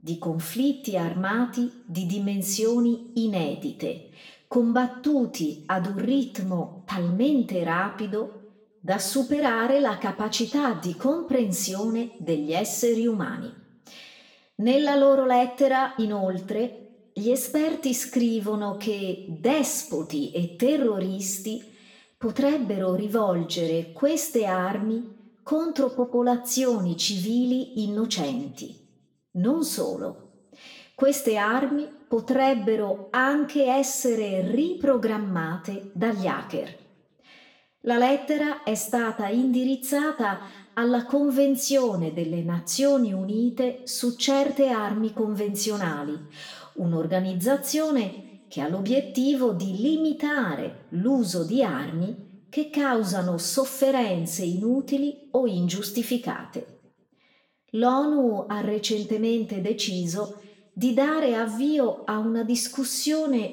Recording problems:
room echo; slight; dies away in 0.6 s
off-mic speech; somewhat distant

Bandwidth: 17.5 kHz